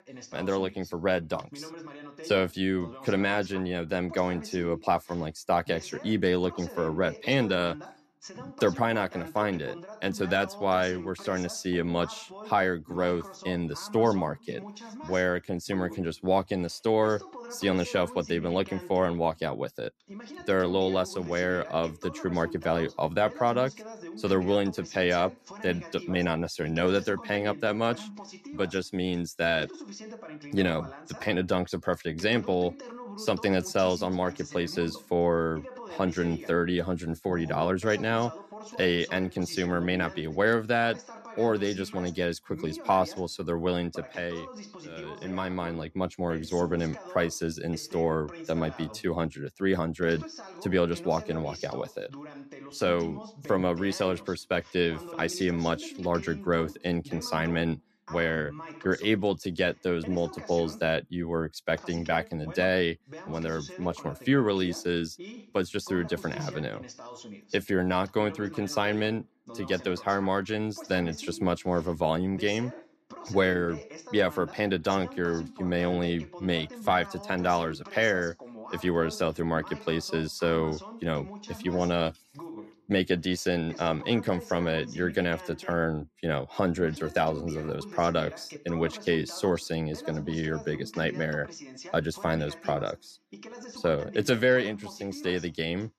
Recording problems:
voice in the background; noticeable; throughout; 15 dB below the speech

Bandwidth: 13.5 kHz